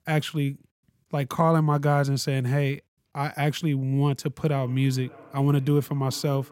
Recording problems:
echo of what is said; faint; from 4.5 s on; 600 ms later, 25 dB below the speech

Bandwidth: 16 kHz